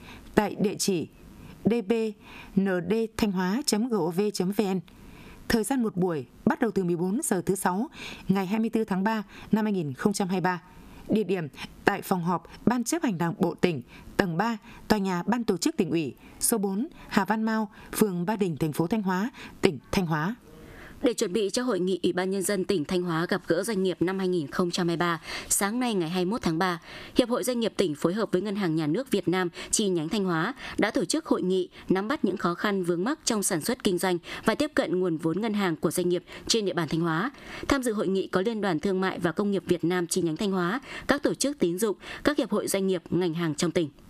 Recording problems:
squashed, flat; somewhat

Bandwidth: 14.5 kHz